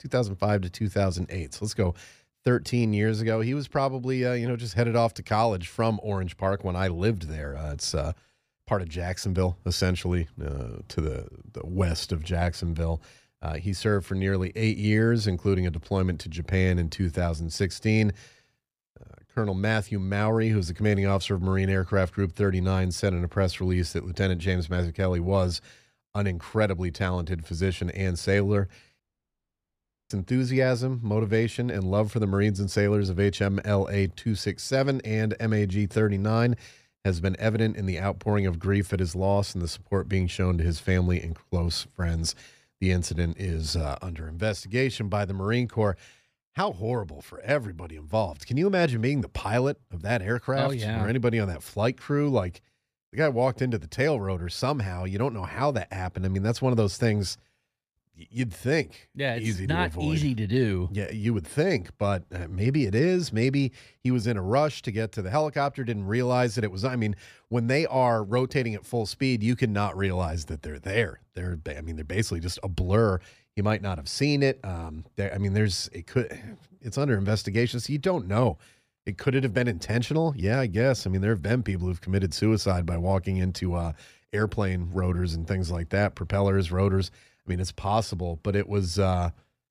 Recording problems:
audio cutting out; at 29 s for 1 s

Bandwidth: 15 kHz